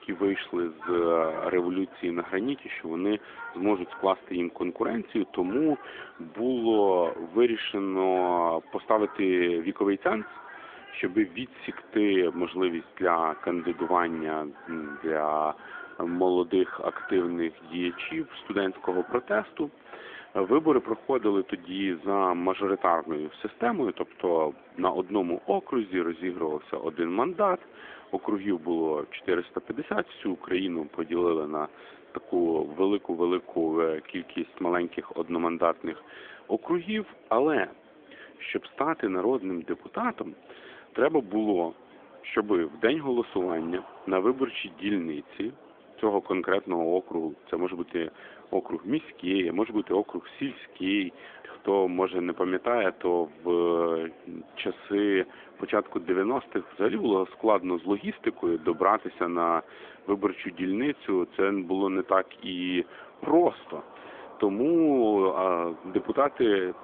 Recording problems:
phone-call audio; nothing above 3.5 kHz
animal sounds; noticeable; throughout; 20 dB below the speech
murmuring crowd; faint; throughout; 25 dB below the speech

